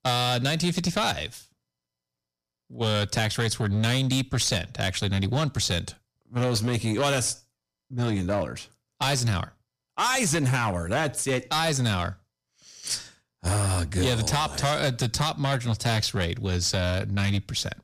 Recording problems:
distortion; slight; 9% of the sound clipped

